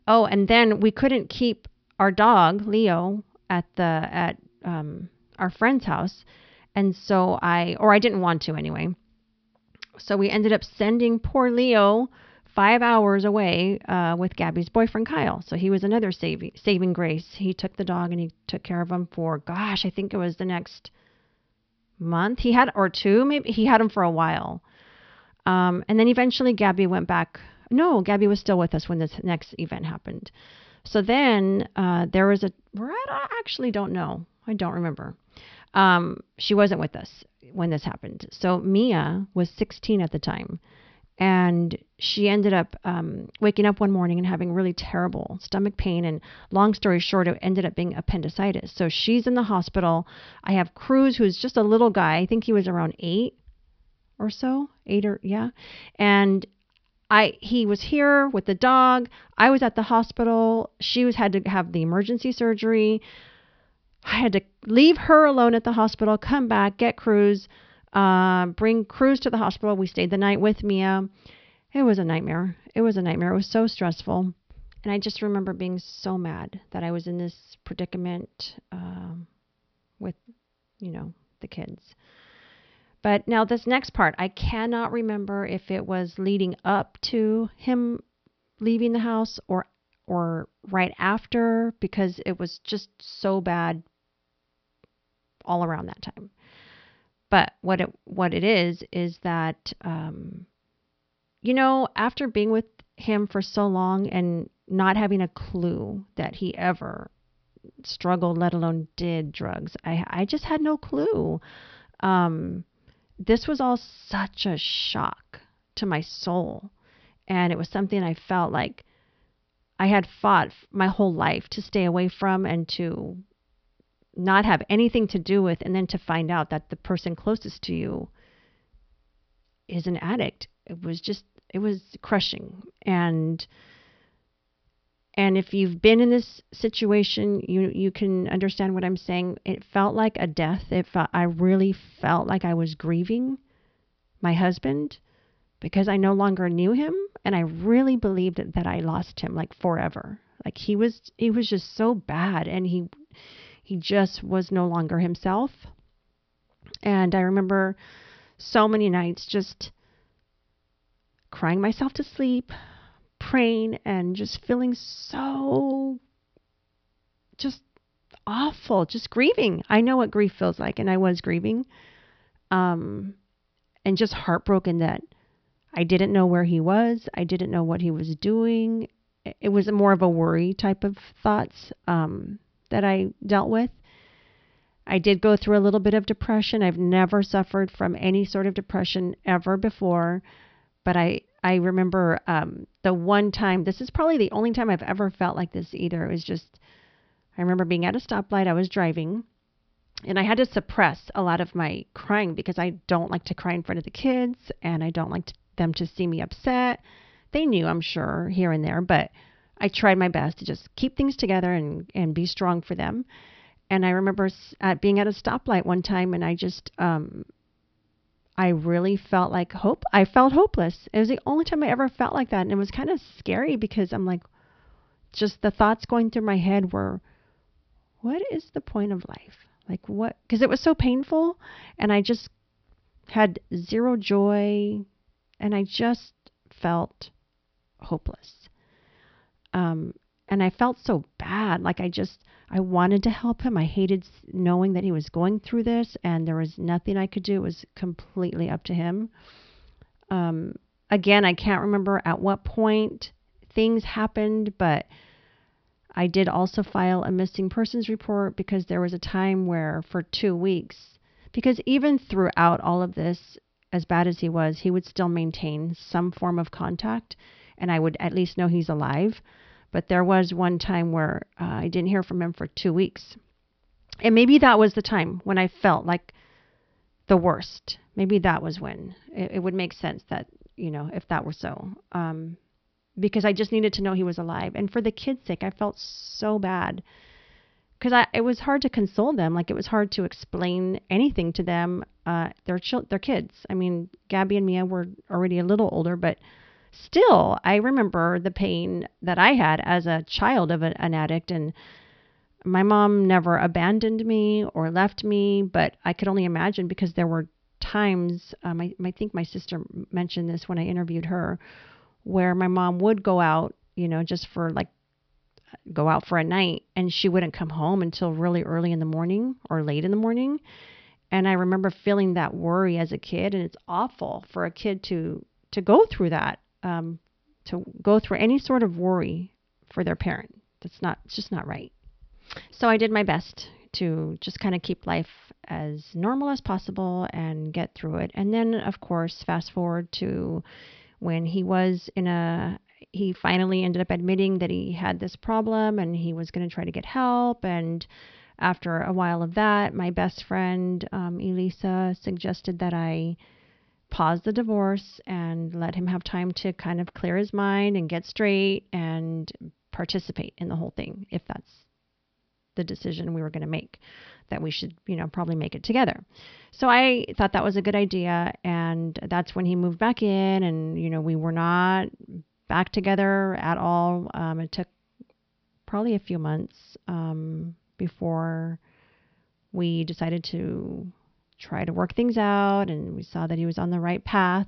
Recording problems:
high frequencies cut off; noticeable; nothing above 5.5 kHz

